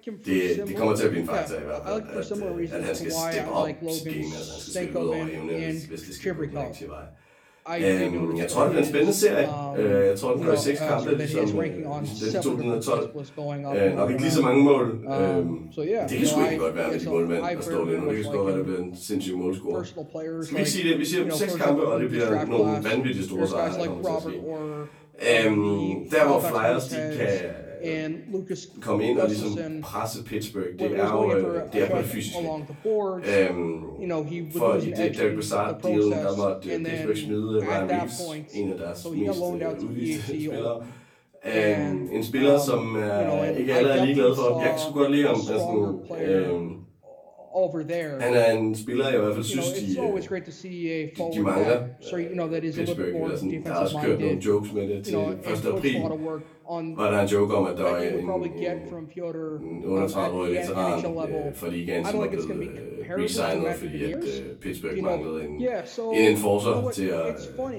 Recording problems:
off-mic speech; far
room echo; slight; dies away in 0.3 s
voice in the background; loud; throughout; 6 dB below the speech

